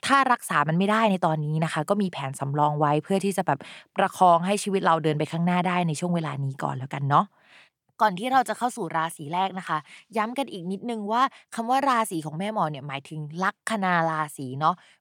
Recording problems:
none

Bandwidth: 18 kHz